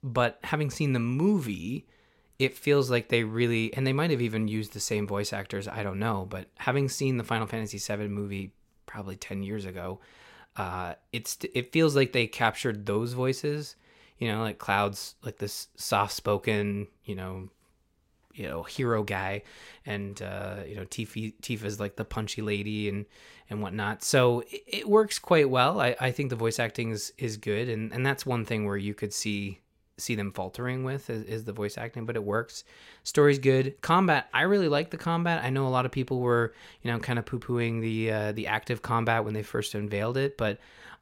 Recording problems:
none

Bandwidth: 16 kHz